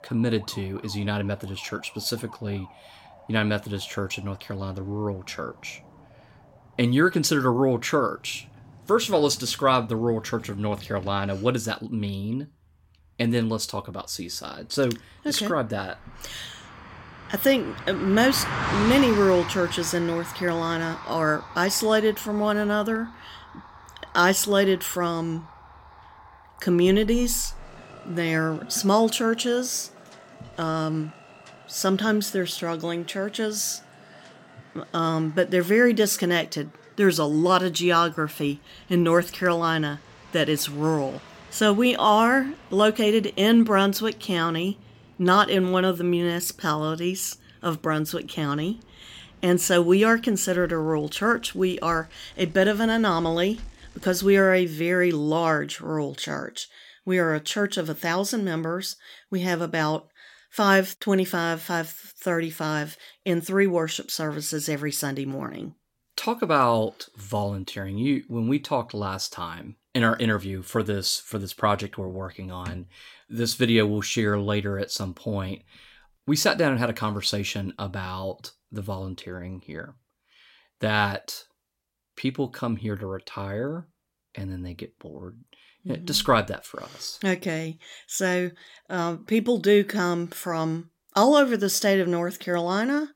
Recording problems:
traffic noise; noticeable; until 54 s; 15 dB below the speech

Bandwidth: 16.5 kHz